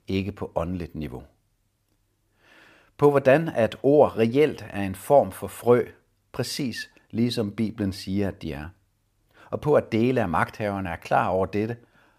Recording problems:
none

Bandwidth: 15 kHz